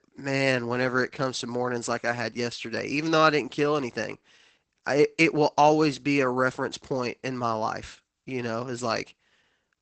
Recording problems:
garbled, watery; badly; nothing above 8 kHz

